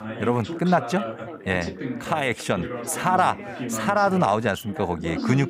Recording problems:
background chatter; loud; throughout; 3 voices, 9 dB below the speech

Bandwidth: 15.5 kHz